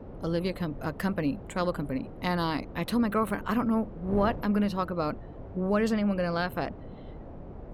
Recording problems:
wind noise on the microphone; occasional gusts; 15 dB below the speech

